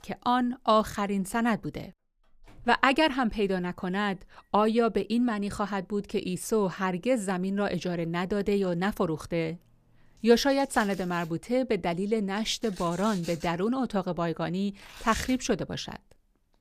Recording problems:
household noises; noticeable; throughout; 20 dB below the speech

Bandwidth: 14.5 kHz